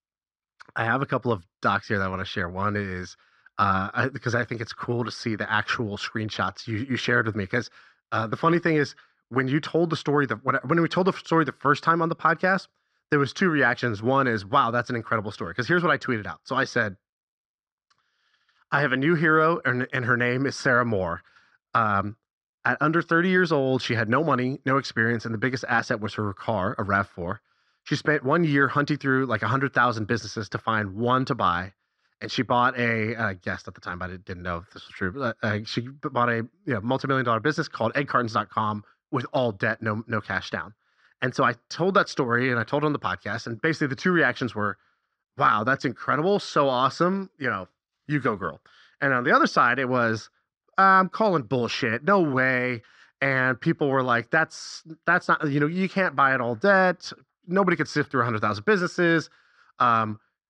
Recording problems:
muffled; very slightly; fading above 5 kHz

